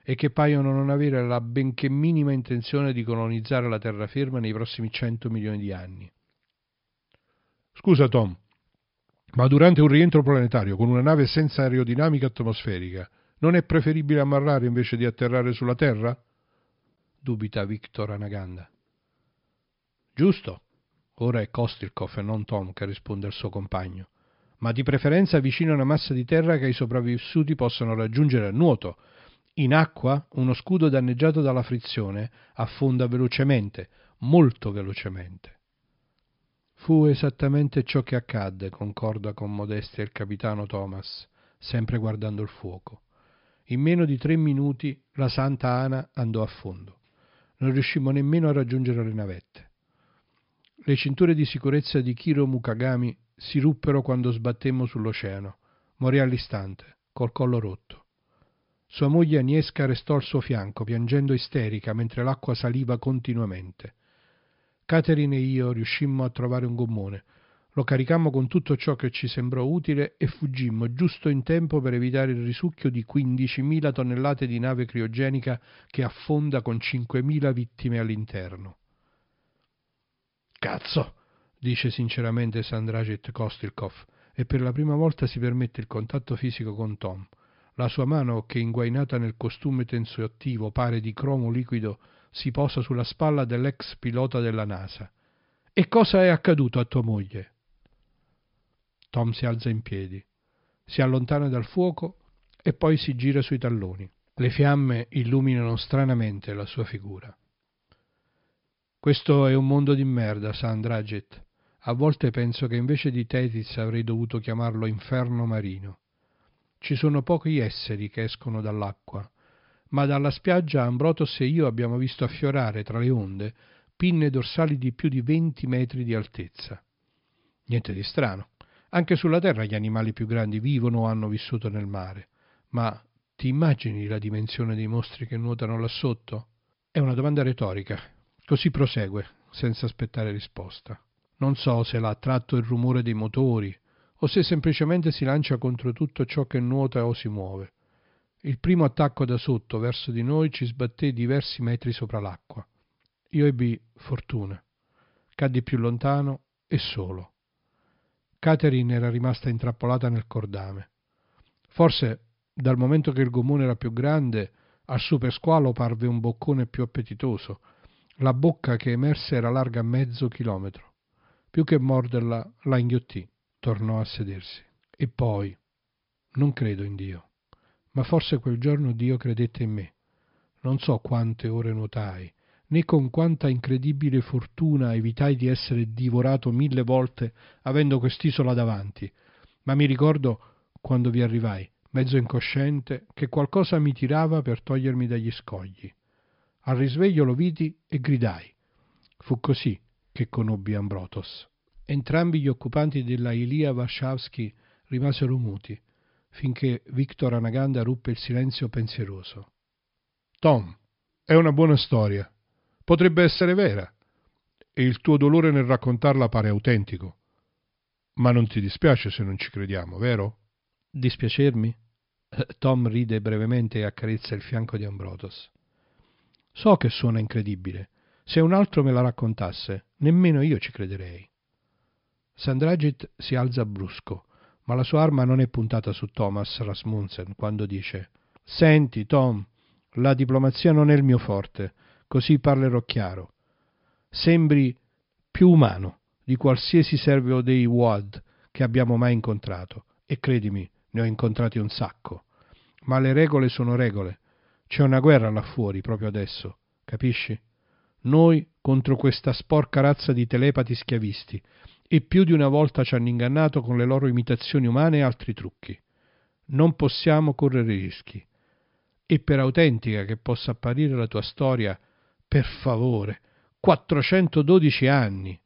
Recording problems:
high frequencies cut off; noticeable; nothing above 5.5 kHz

